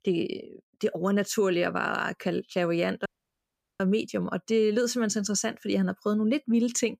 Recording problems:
audio cutting out; at 3 s for 0.5 s

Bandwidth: 15 kHz